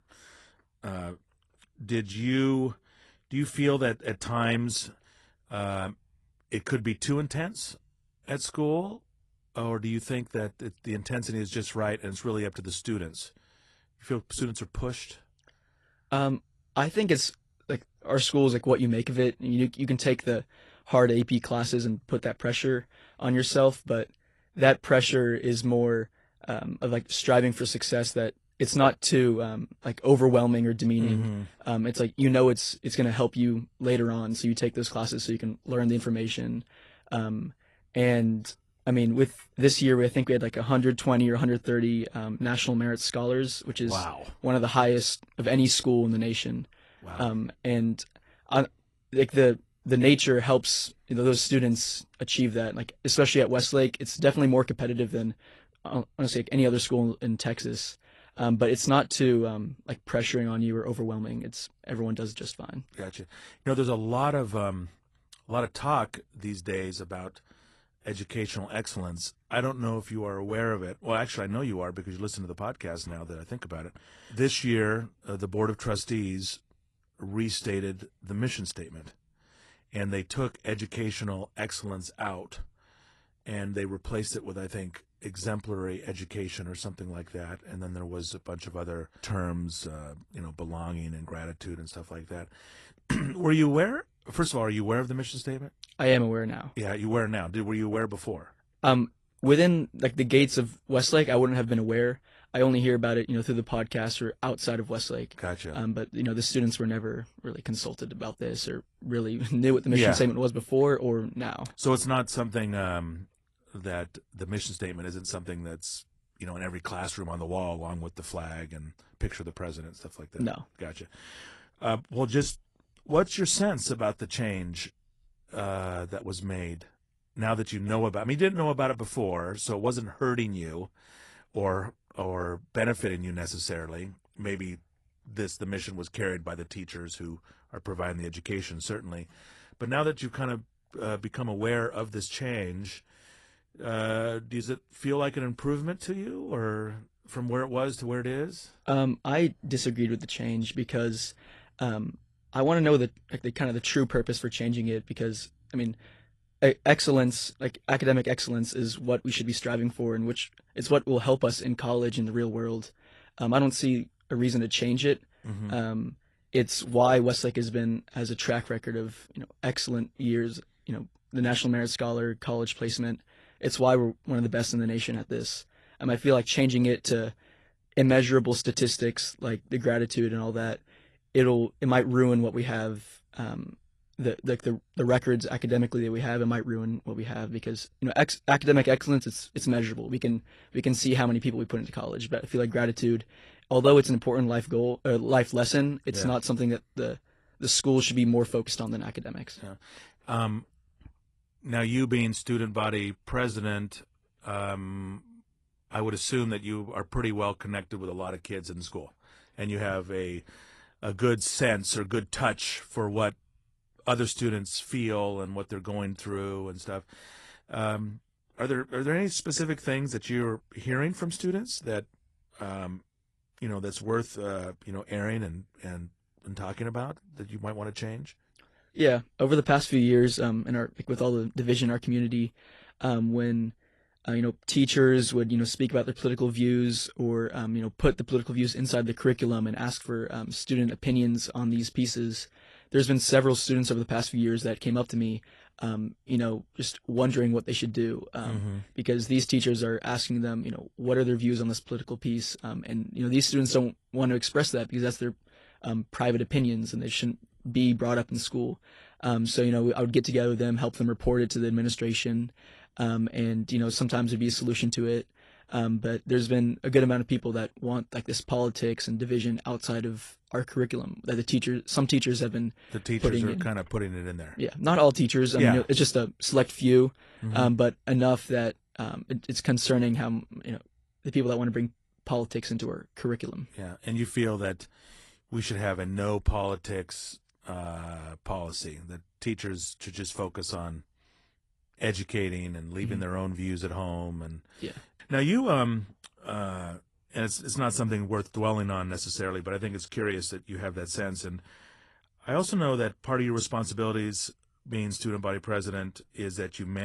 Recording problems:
garbled, watery; slightly
abrupt cut into speech; at the end

